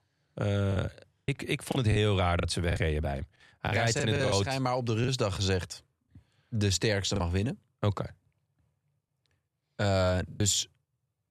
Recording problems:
choppy; very; 8% of the speech affected

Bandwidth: 13.5 kHz